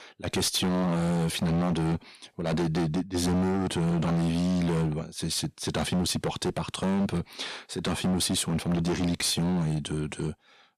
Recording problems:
distortion; heavy; 20% of the sound clipped

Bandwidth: 14 kHz